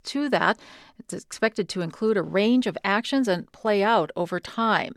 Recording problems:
none

